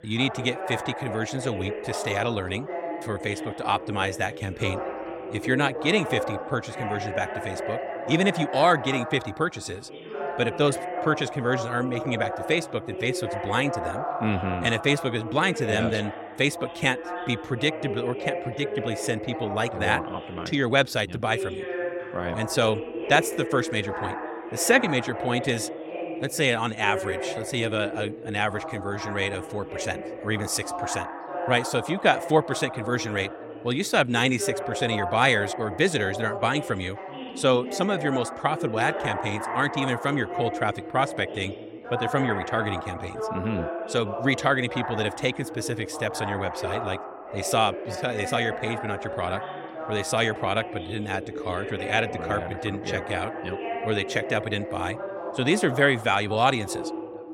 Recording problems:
background chatter; loud; throughout; 2 voices, 7 dB below the speech

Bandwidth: 17 kHz